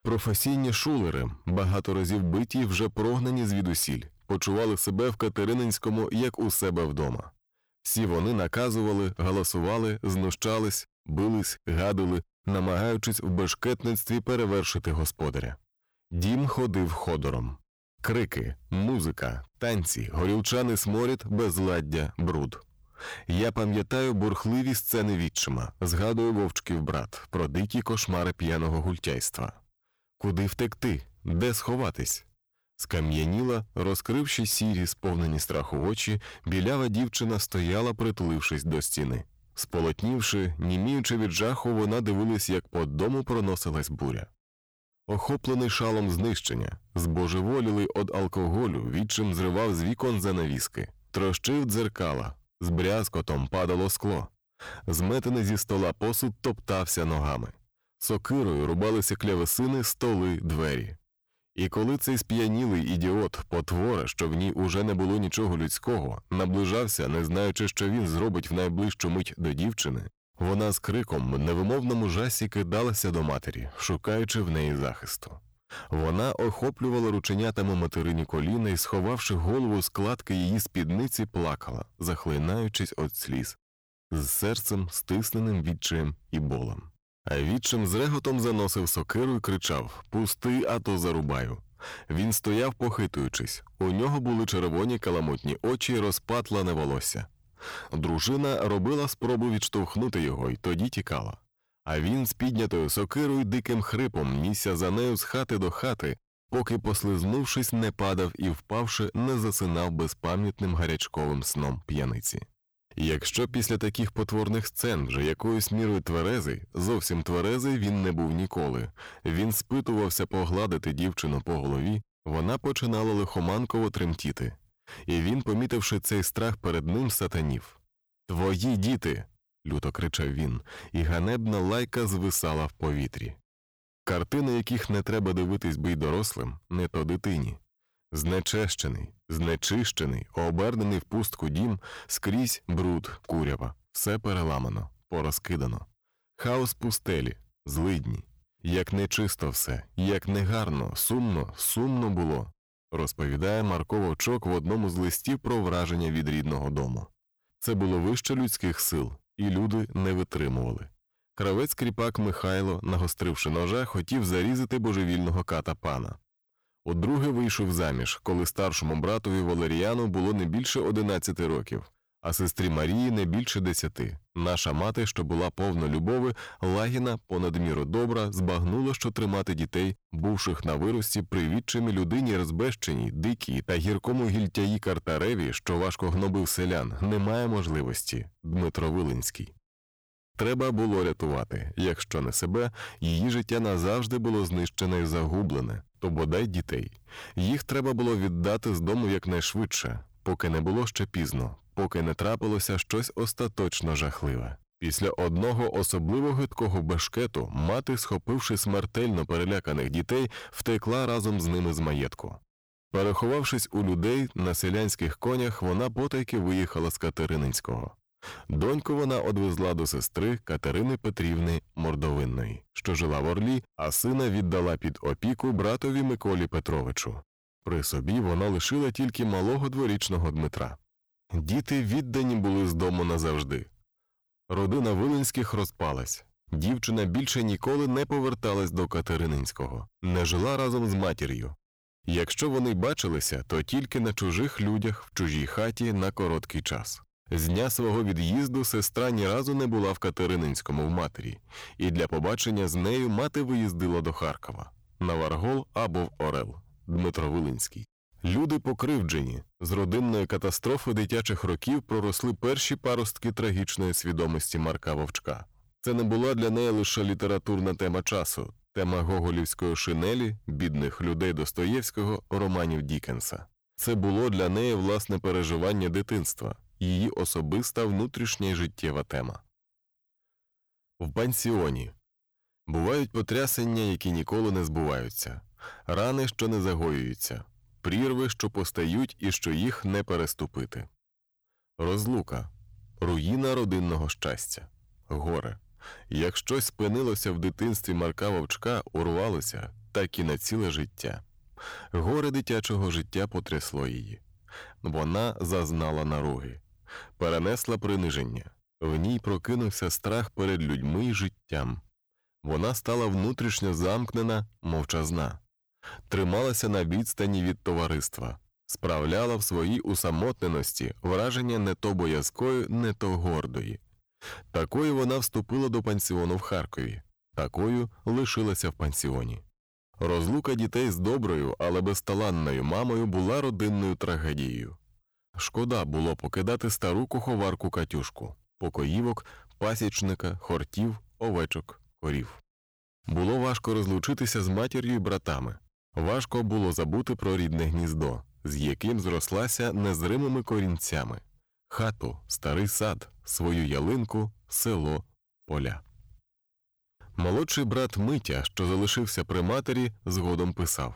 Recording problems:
distortion; slight; 12% of the sound clipped

